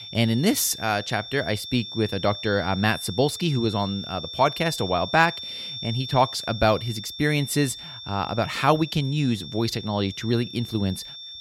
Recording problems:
high-pitched whine; loud; throughout; 3.5 kHz, 10 dB below the speech

